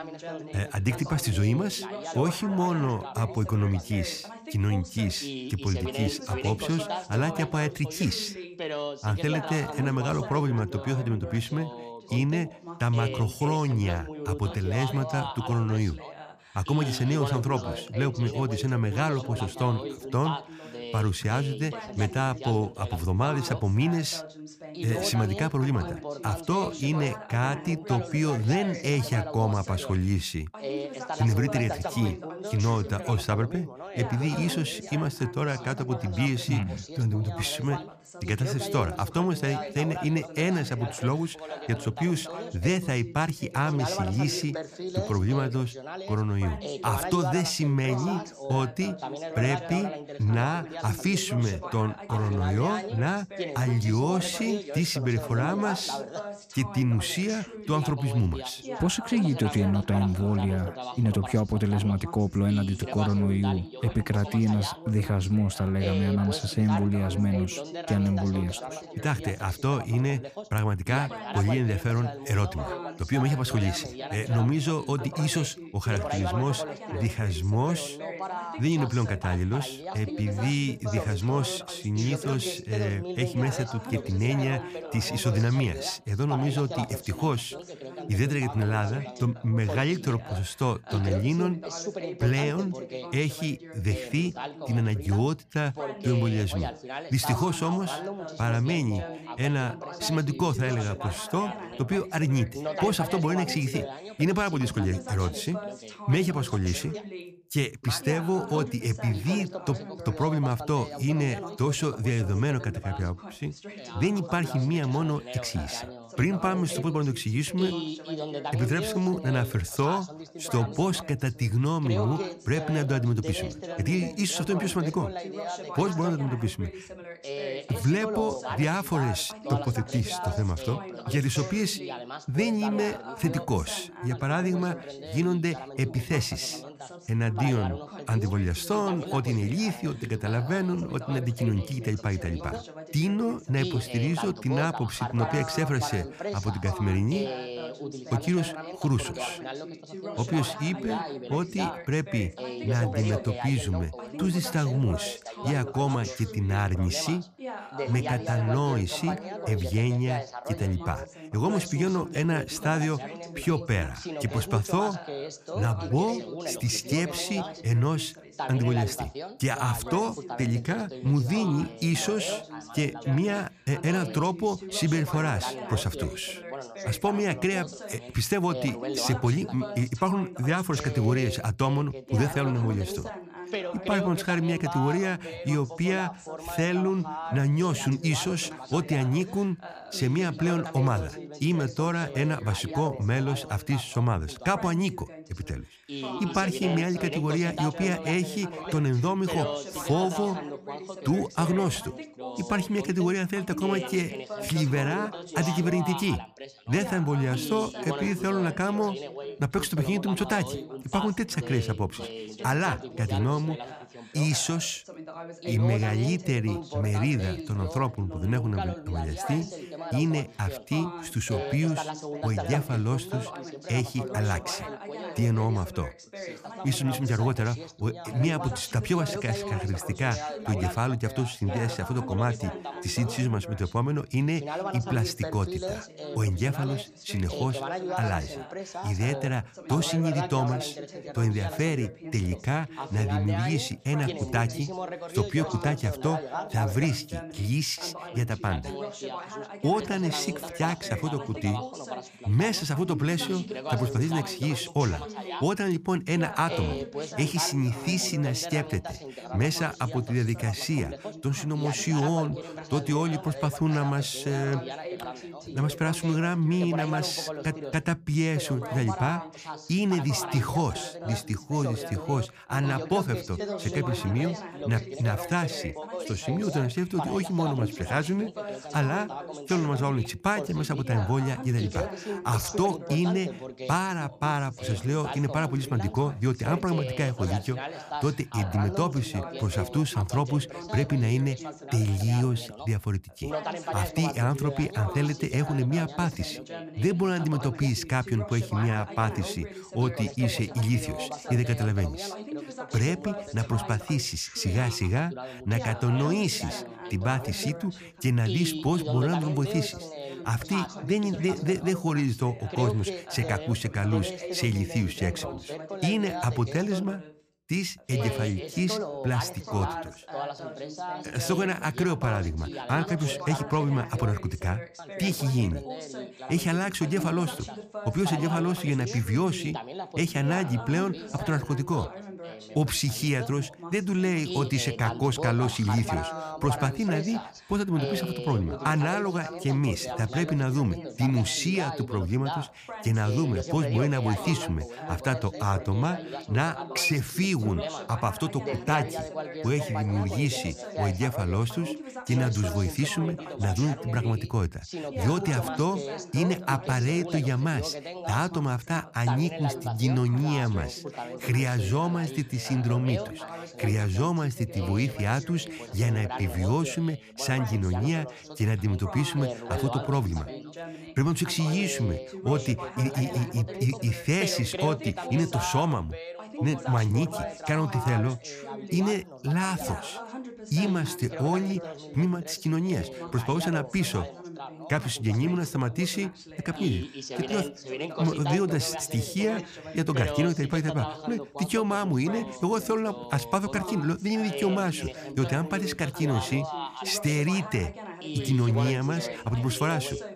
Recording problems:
background chatter; loud; throughout; 2 voices, 9 dB below the speech

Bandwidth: 15 kHz